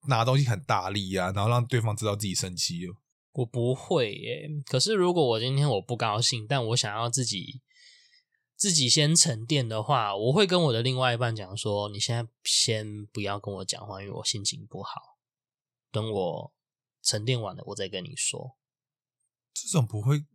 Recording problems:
none

